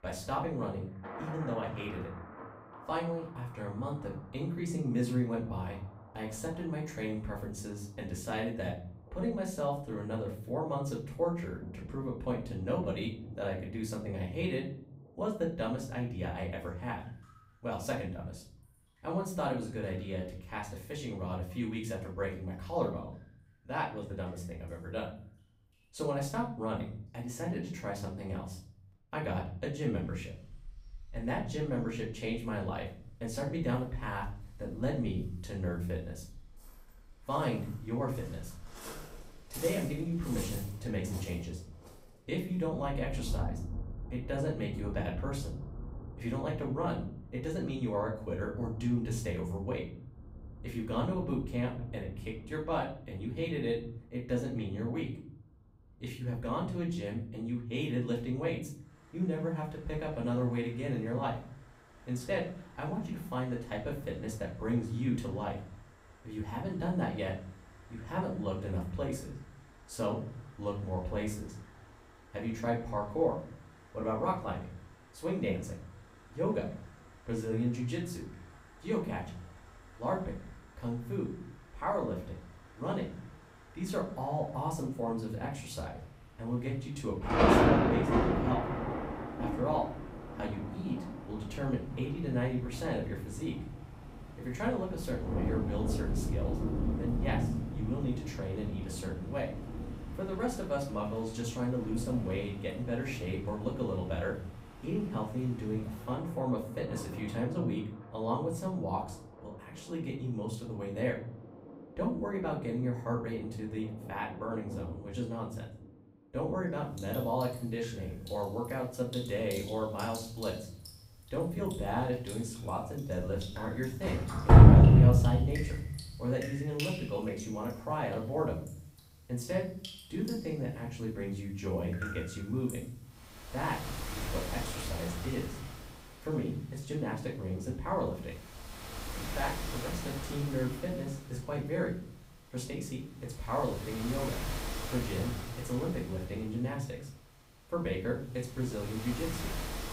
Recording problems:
off-mic speech; far
room echo; slight; dies away in 0.5 s
rain or running water; very loud; throughout; 4 dB above the speech

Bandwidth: 15.5 kHz